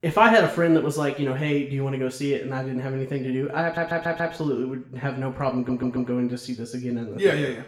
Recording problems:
room echo; slight; dies away in 0.6 s
off-mic speech; somewhat distant
audio stuttering; at 3.5 s and at 5.5 s

